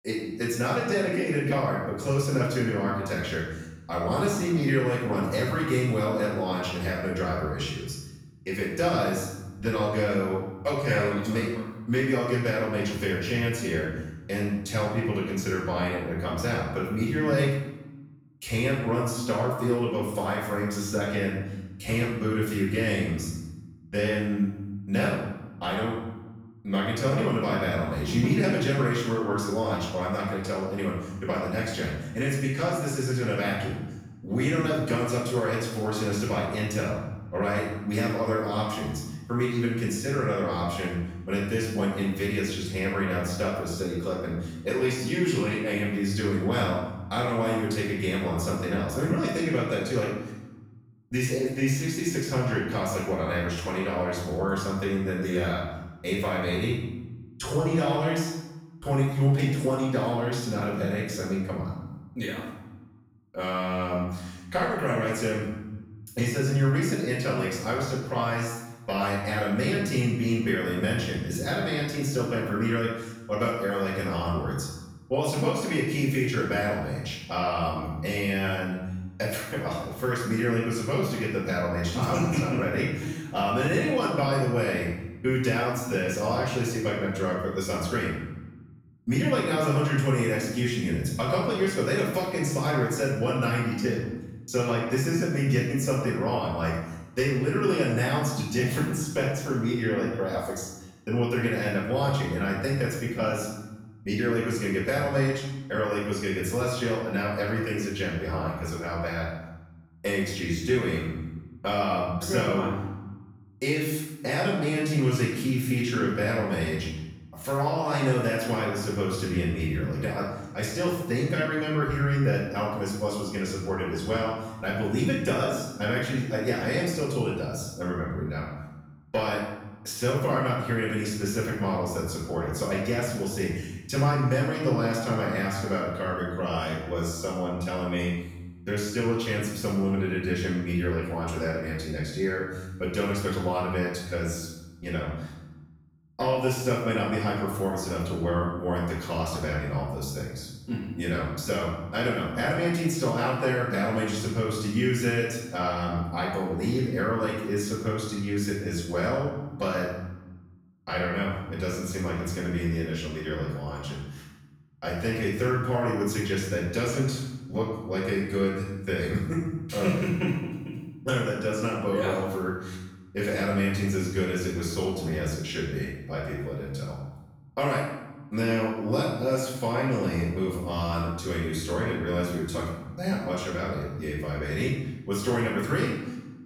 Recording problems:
off-mic speech; far
room echo; noticeable; dies away in 1 s

